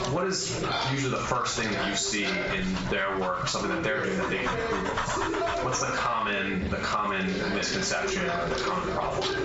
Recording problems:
off-mic speech; far
squashed, flat; heavily
room echo; noticeable; dies away in 0.3 s
high frequencies cut off; noticeable; nothing above 8 kHz
animal sounds; loud; throughout; 7 dB below the speech
voice in the background; loud; throughout; 5 dB below the speech

